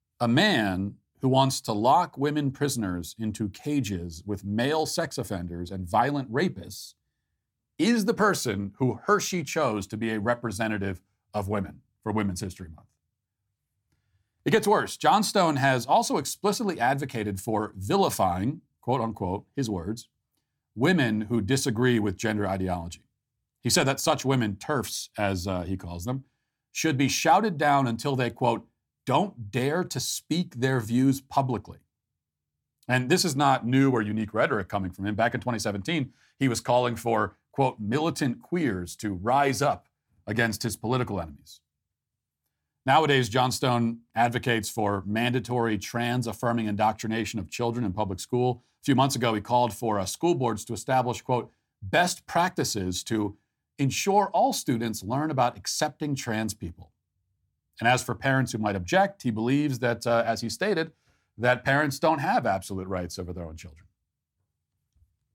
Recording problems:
none

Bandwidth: 17.5 kHz